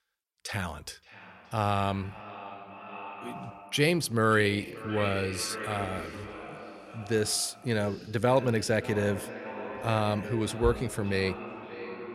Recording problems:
echo of what is said; strong; throughout; 570 ms later, 10 dB below the speech

